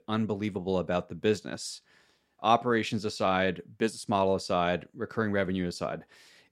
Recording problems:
none

